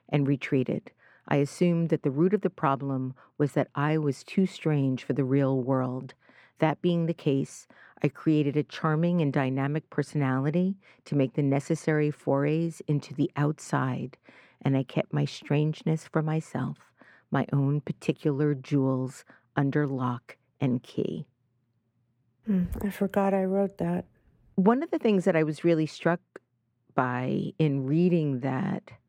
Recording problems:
muffled; slightly; fading above 3.5 kHz

